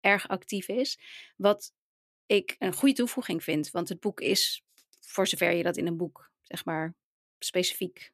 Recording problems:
none

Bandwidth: 14.5 kHz